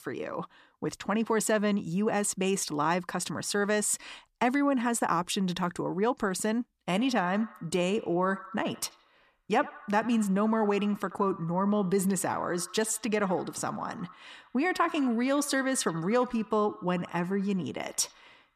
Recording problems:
echo of what is said; faint; from 7 s on; 80 ms later, 20 dB below the speech

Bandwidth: 14.5 kHz